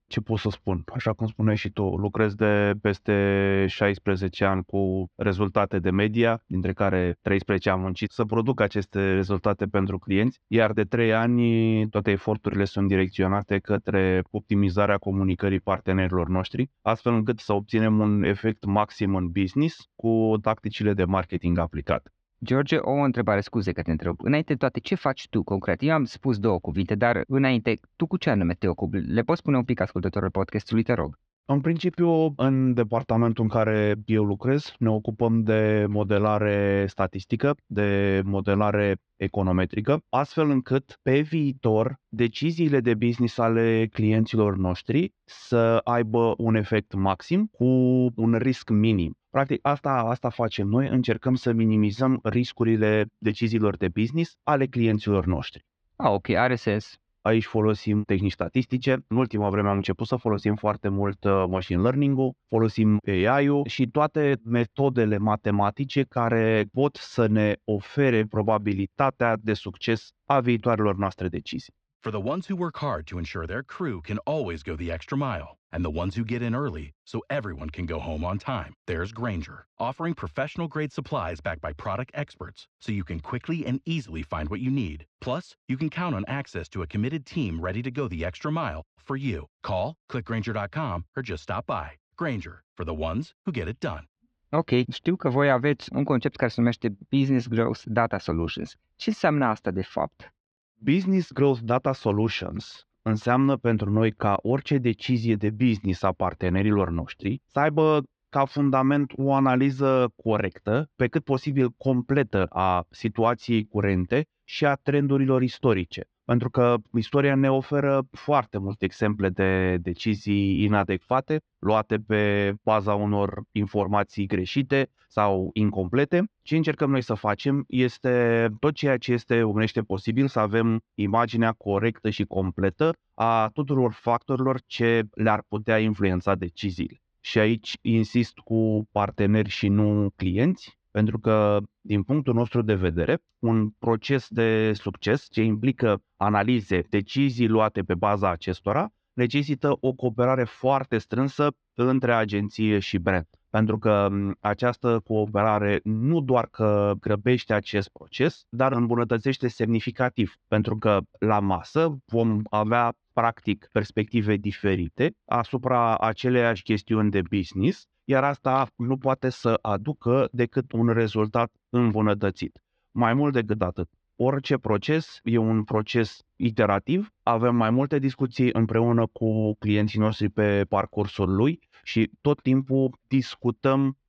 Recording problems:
muffled; very slightly; fading above 4.5 kHz

